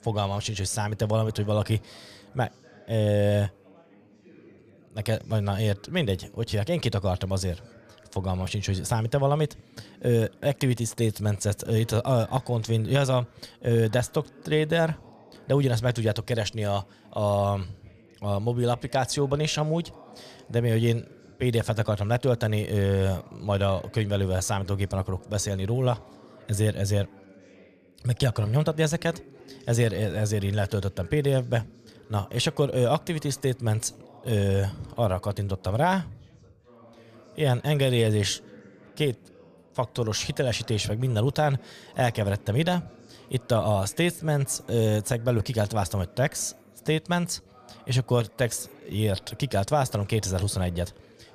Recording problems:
background chatter; faint; throughout; 2 voices, 25 dB below the speech

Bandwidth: 14.5 kHz